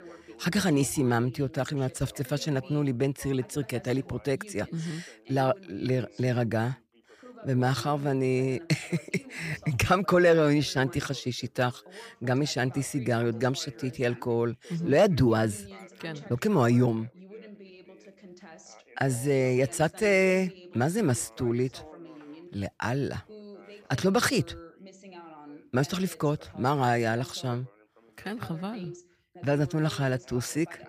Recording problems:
background chatter; faint; throughout; 2 voices, 20 dB below the speech

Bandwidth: 15 kHz